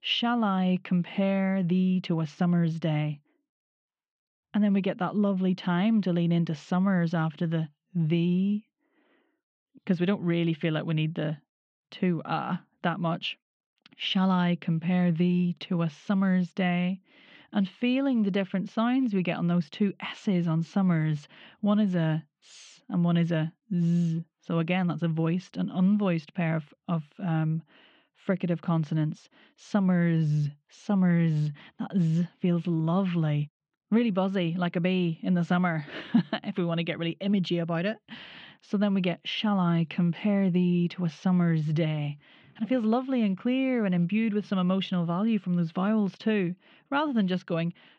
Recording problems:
muffled; very; fading above 3.5 kHz

